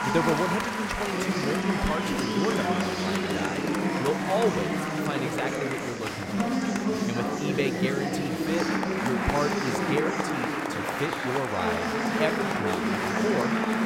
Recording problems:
chatter from many people; very loud; throughout; 4 dB above the speech

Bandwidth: 16 kHz